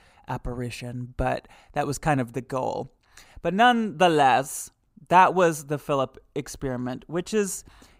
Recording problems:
none

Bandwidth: 15.5 kHz